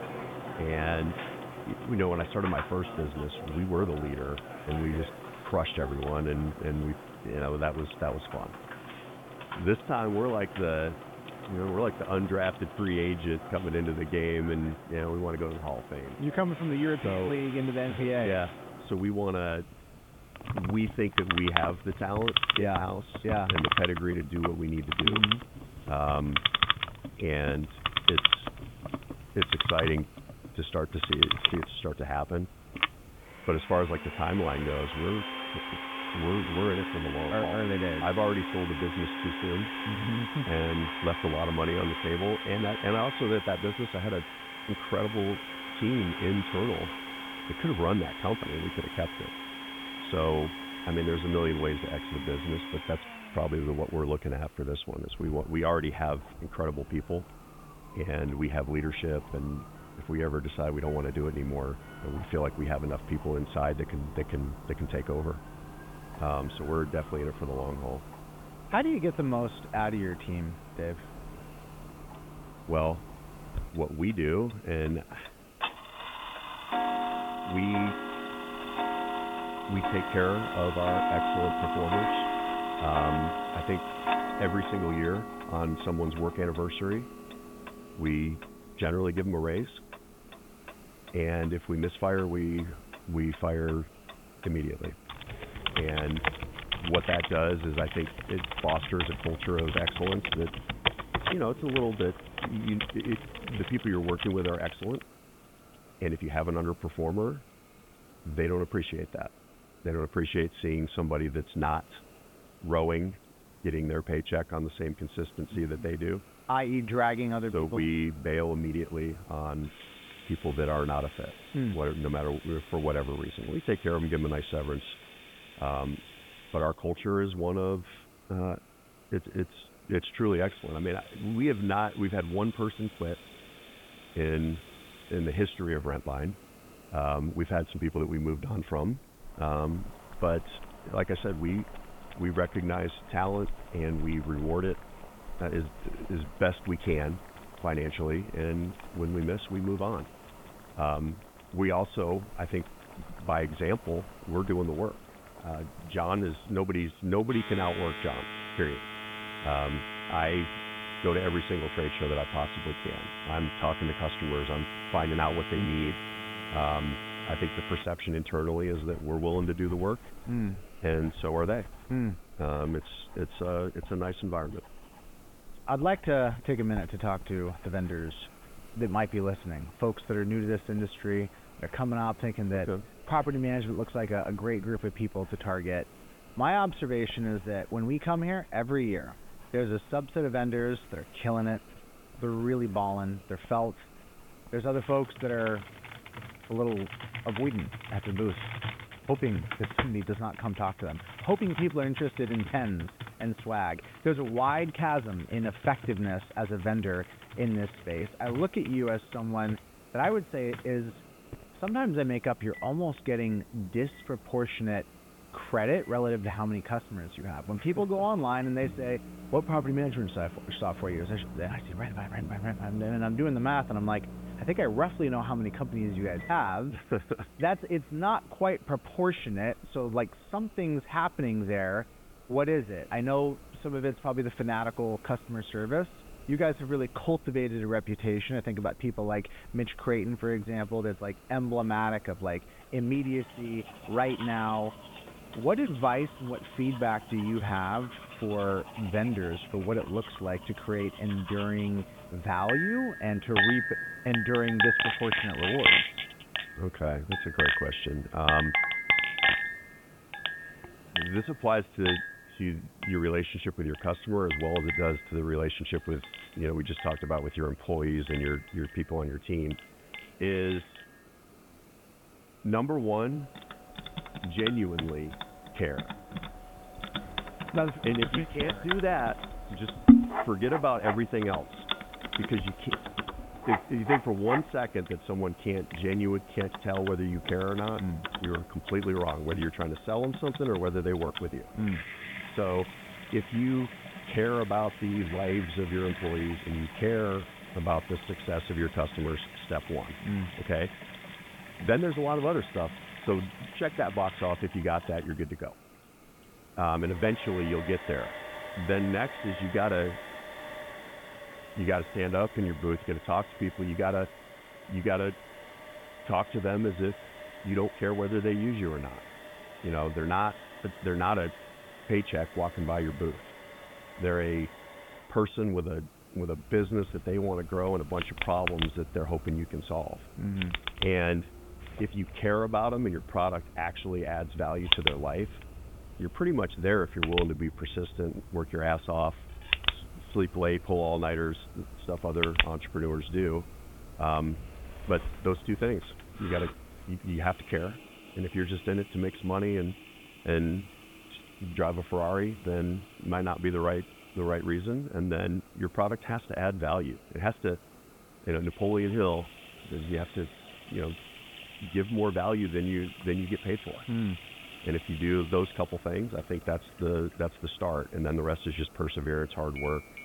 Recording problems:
high frequencies cut off; severe; nothing above 3.5 kHz
household noises; loud; throughout; 3 dB below the speech
hiss; faint; throughout; 25 dB below the speech

